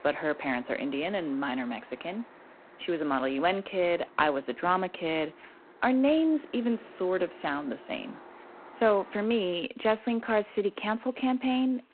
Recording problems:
phone-call audio; poor line
traffic noise; faint; throughout; 20 dB below the speech

